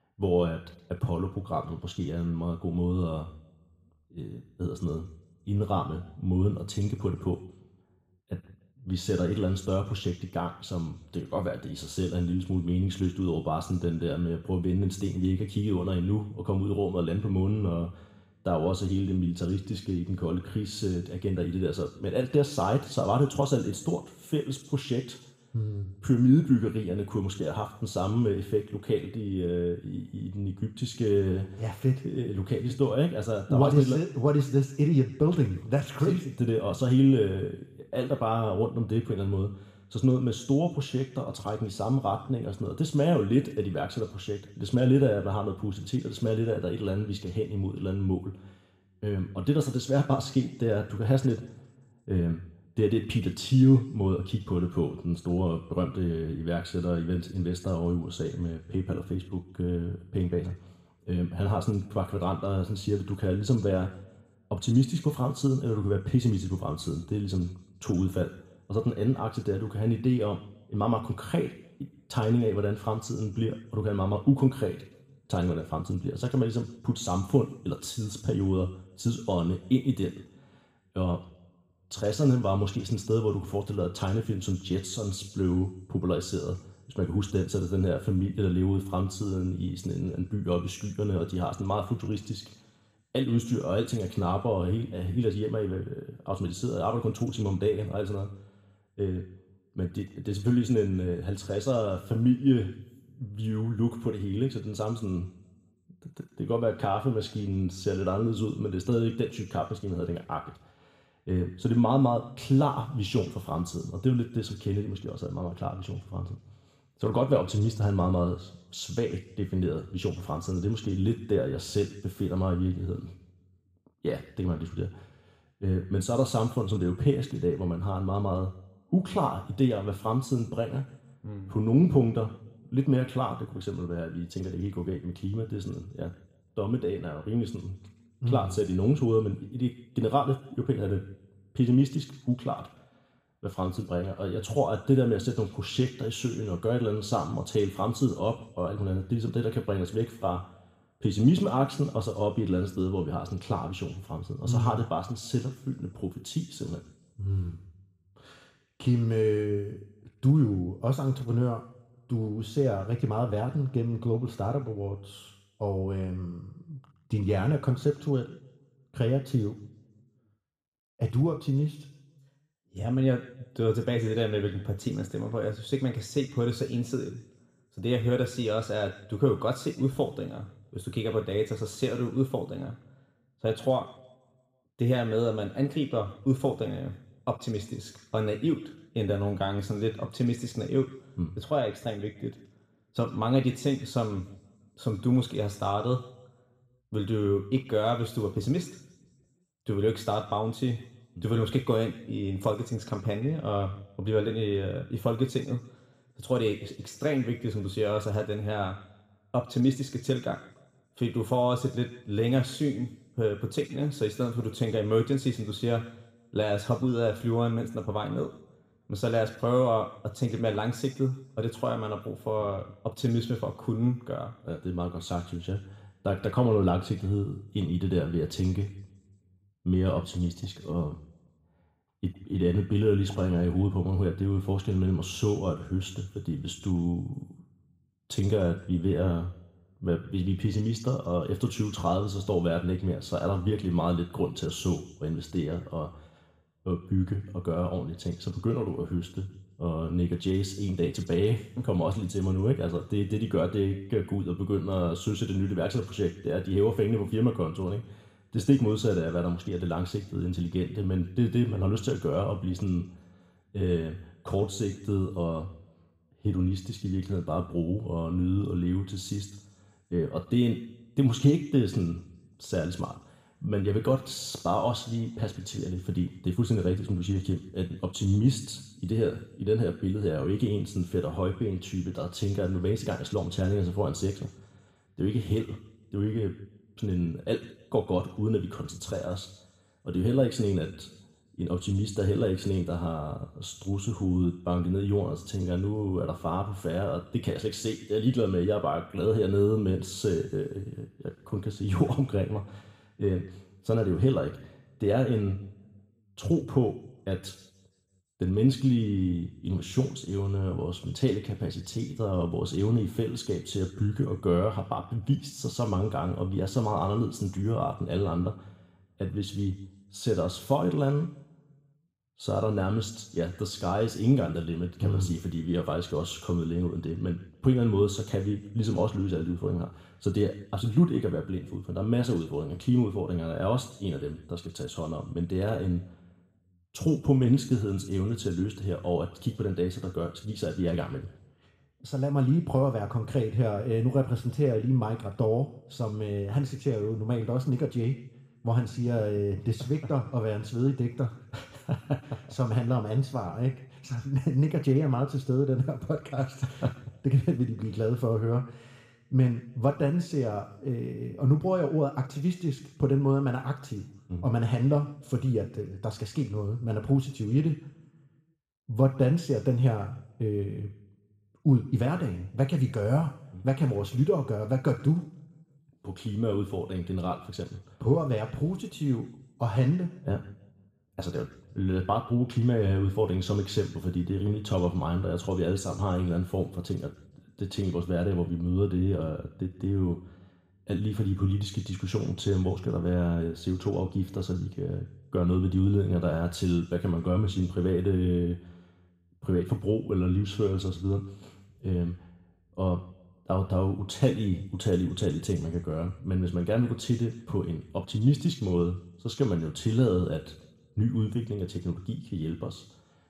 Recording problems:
room echo; slight; dies away in 0.7 s
off-mic speech; somewhat distant

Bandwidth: 15 kHz